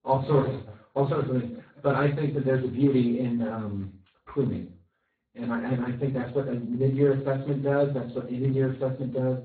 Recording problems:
off-mic speech; far
garbled, watery; badly; nothing above 4 kHz
room echo; slight; dies away in 0.4 s

